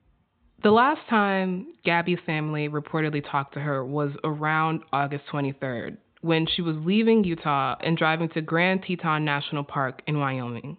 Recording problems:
high frequencies cut off; severe; nothing above 4 kHz

